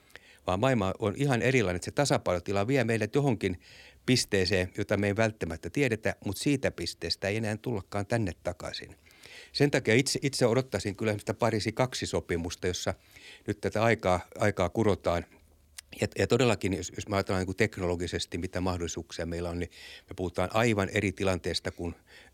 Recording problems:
none

